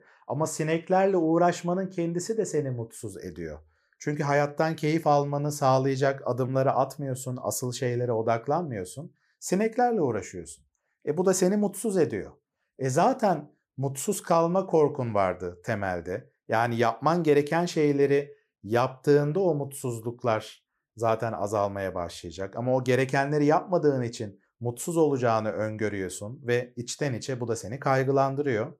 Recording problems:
none

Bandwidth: 15 kHz